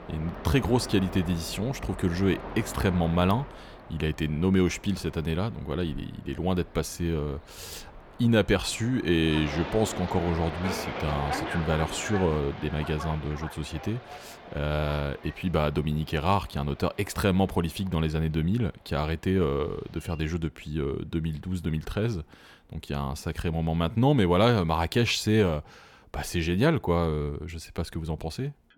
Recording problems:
train or aircraft noise; noticeable; throughout; 10 dB below the speech

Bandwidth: 18.5 kHz